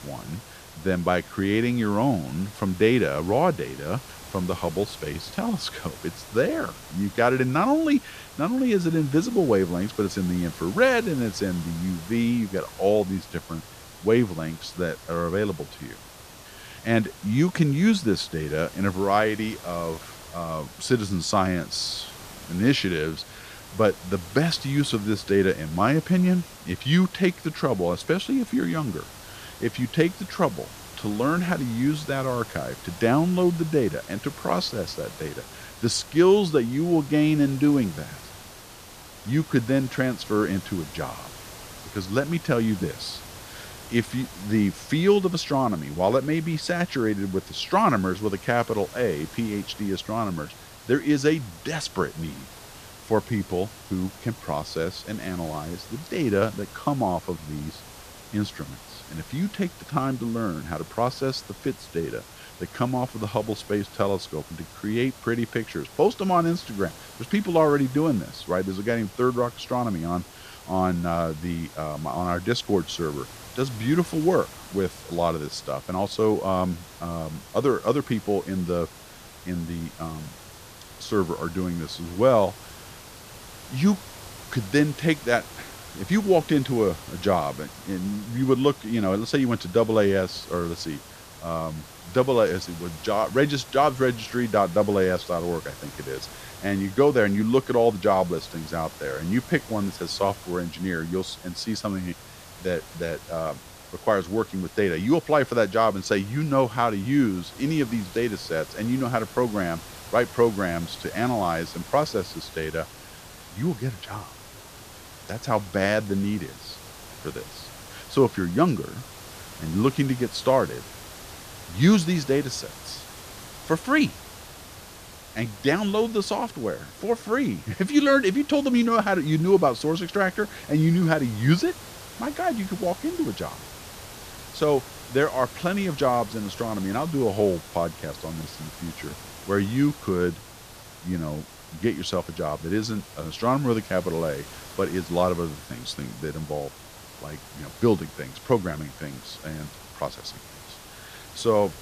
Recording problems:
hiss; noticeable; throughout; 15 dB below the speech

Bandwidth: 14.5 kHz